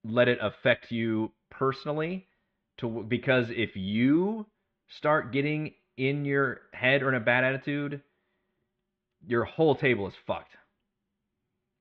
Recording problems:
muffled; very; fading above 3.5 kHz

